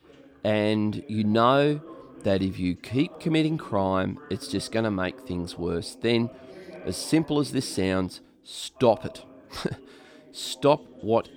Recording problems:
background chatter; noticeable; throughout; 2 voices, 20 dB below the speech

